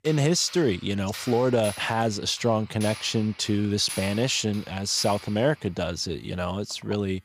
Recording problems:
household noises; noticeable; throughout; 15 dB below the speech

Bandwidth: 15.5 kHz